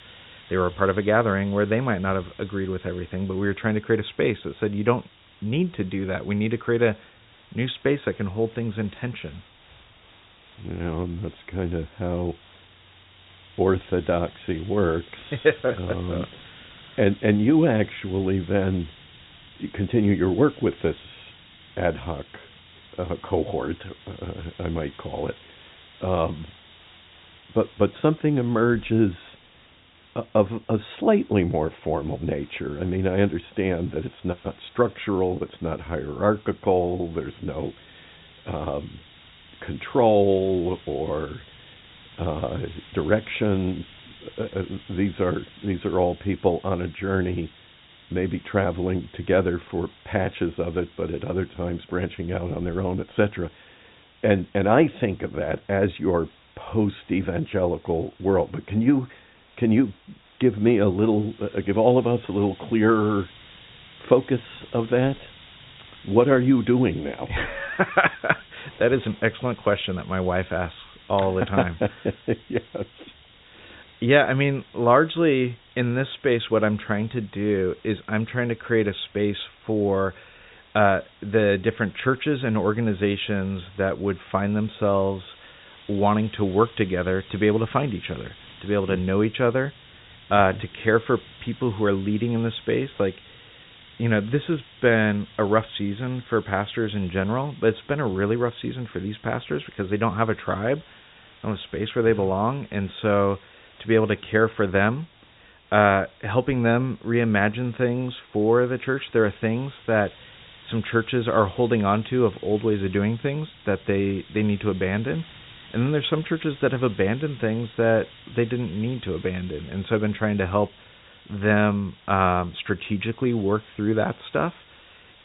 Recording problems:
high frequencies cut off; severe; nothing above 4 kHz
hiss; faint; throughout; 25 dB below the speech

